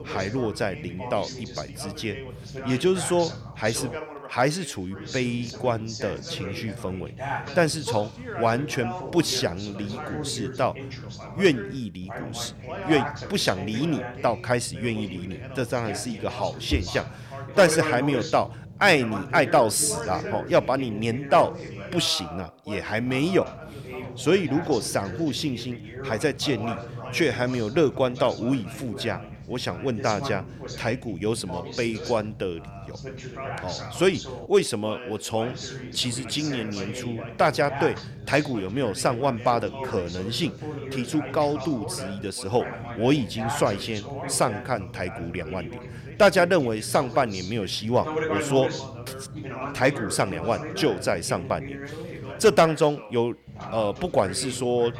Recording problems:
background chatter; loud; throughout; 2 voices, 10 dB below the speech

